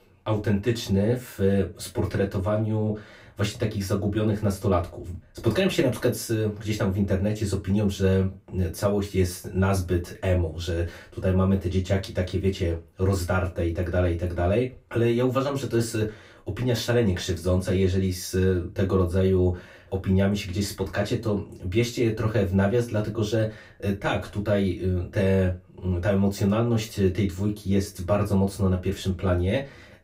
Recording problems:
off-mic speech; far
room echo; very slight; dies away in 0.2 s

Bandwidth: 15.5 kHz